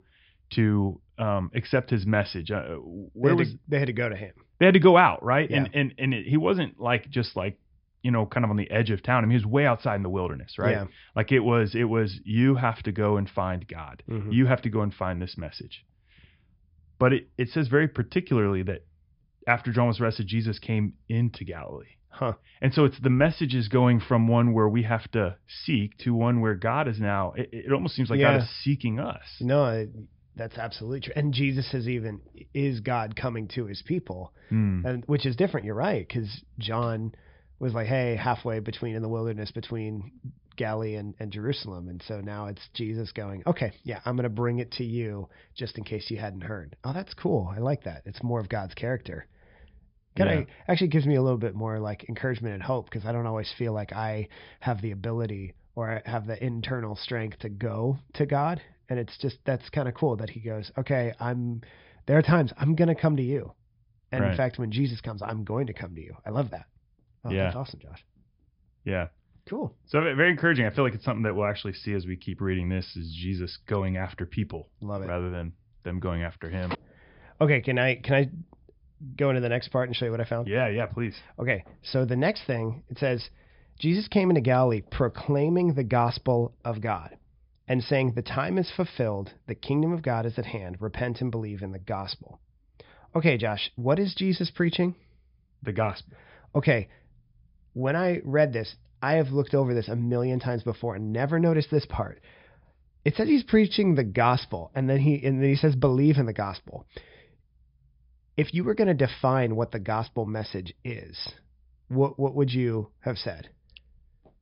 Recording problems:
high frequencies cut off; noticeable; nothing above 5.5 kHz

